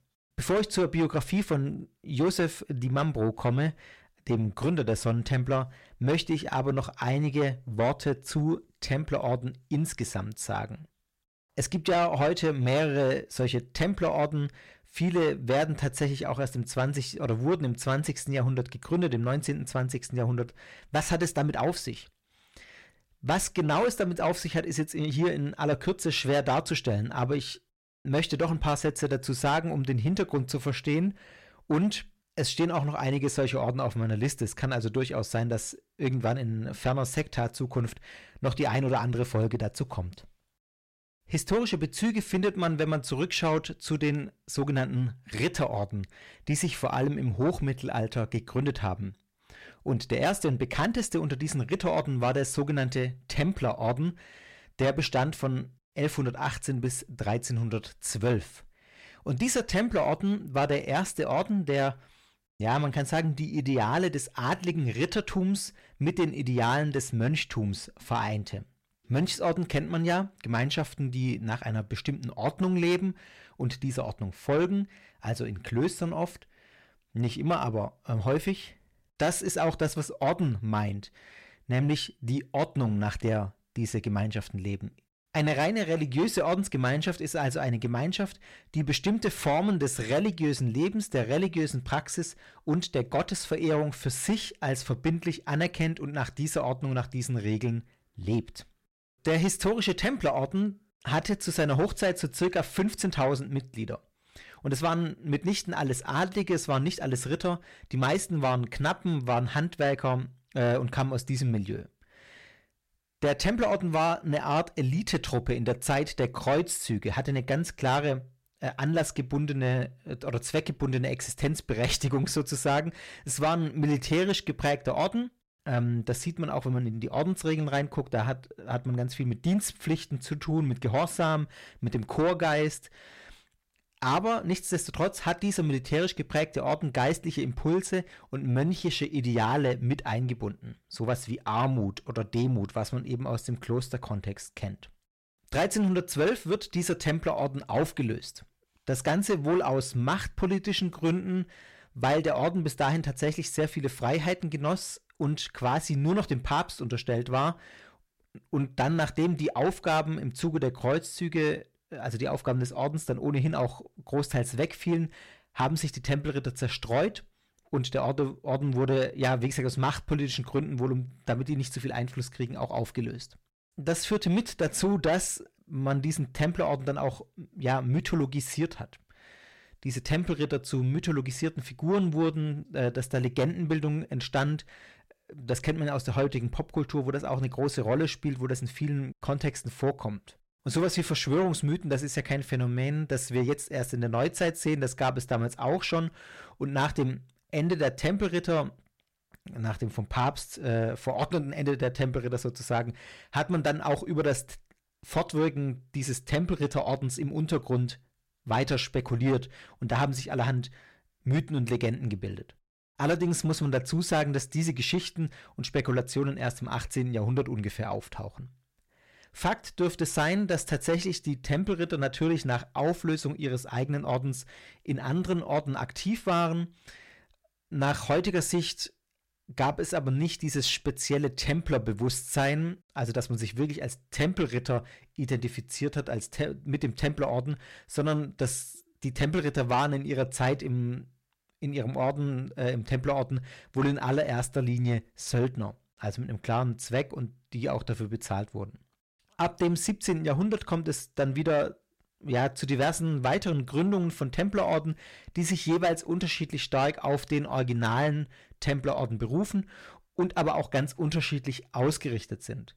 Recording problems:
distortion; slight; 10 dB below the speech

